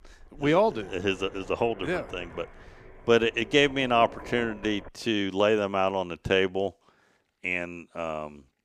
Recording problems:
low rumble; noticeable; until 5 s; 20 dB below the speech

